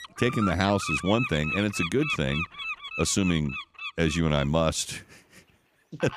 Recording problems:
animal sounds; loud; throughout; 6 dB below the speech

